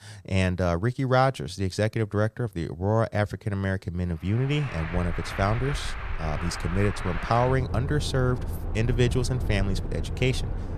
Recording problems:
traffic noise; loud; from 4.5 s on; 7 dB below the speech

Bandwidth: 14.5 kHz